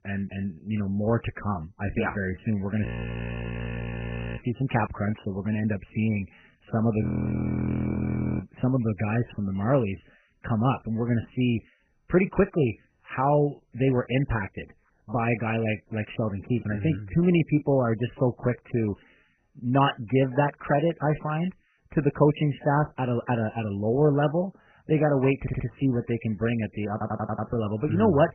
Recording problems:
garbled, watery; badly; nothing above 3 kHz
audio freezing; at 3 s for 1.5 s and at 7 s for 1.5 s
audio stuttering; at 25 s and at 27 s

